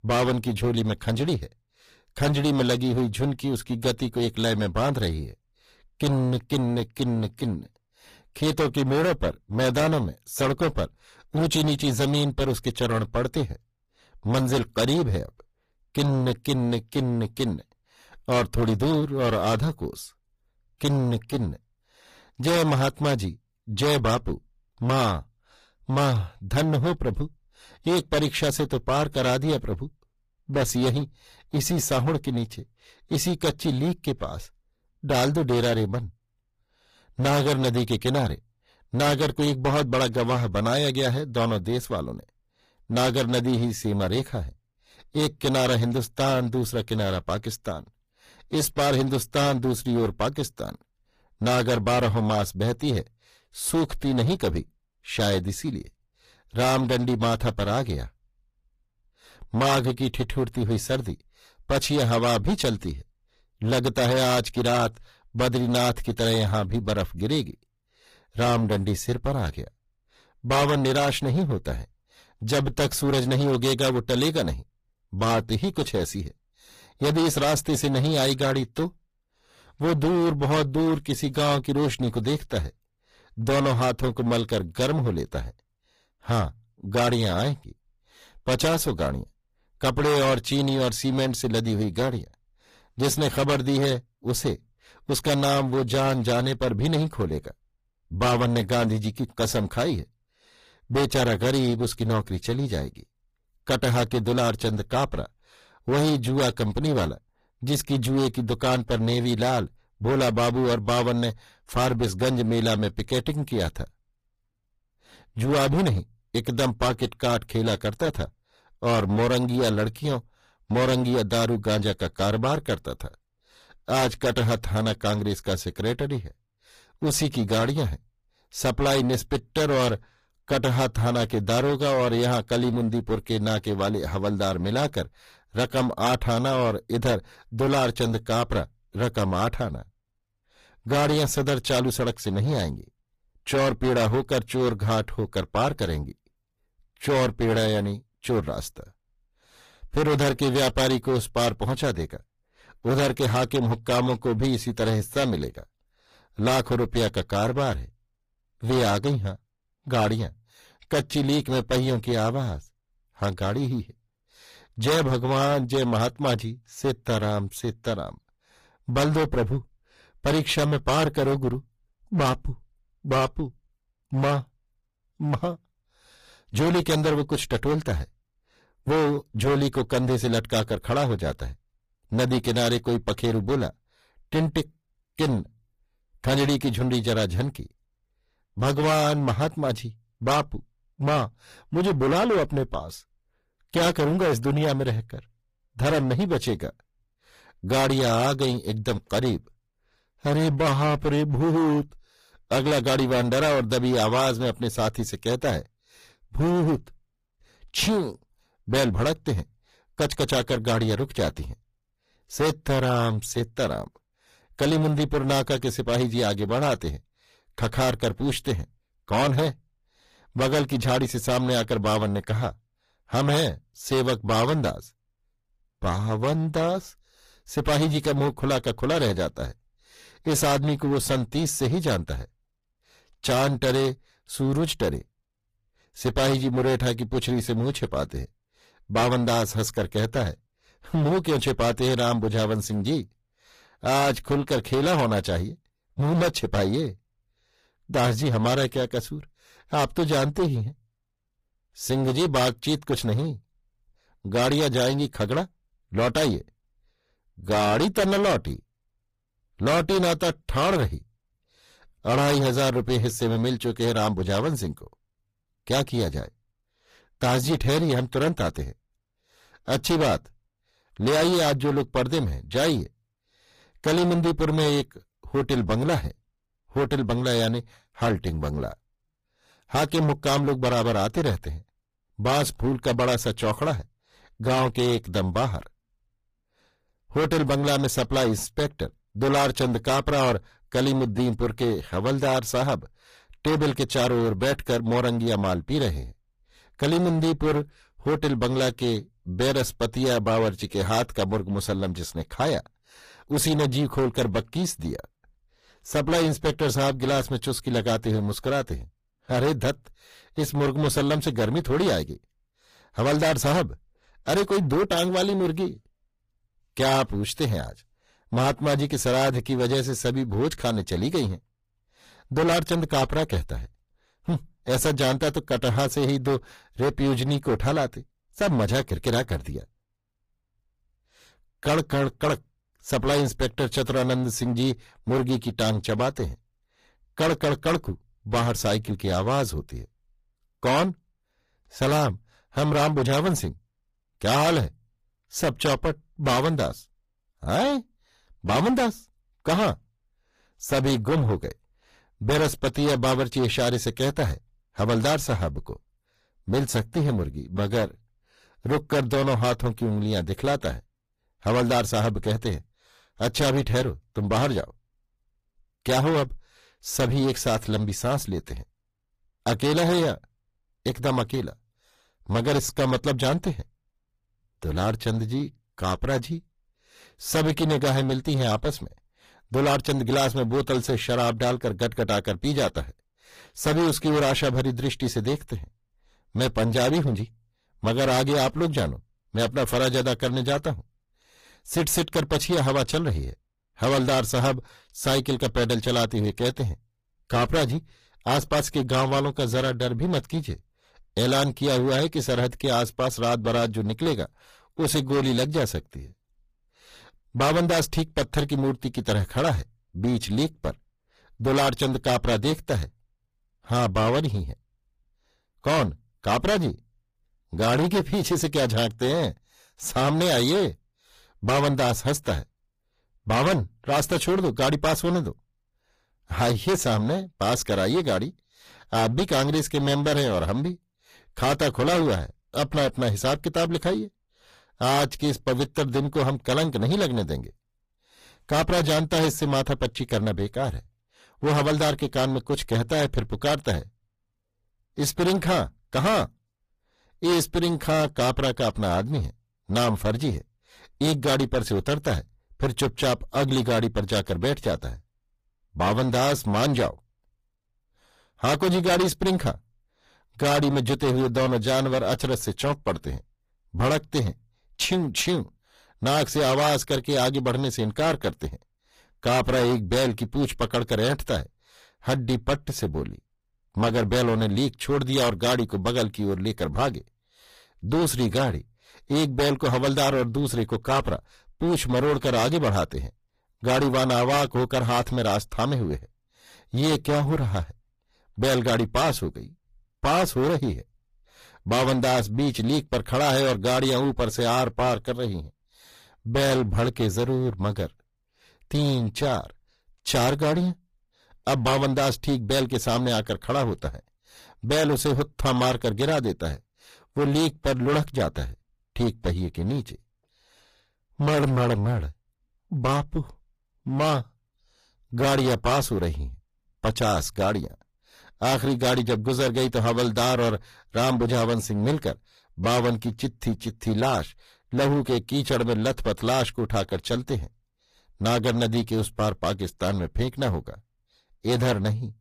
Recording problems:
distortion; heavy; 15% of the sound clipped
garbled, watery; slightly; nothing above 15 kHz

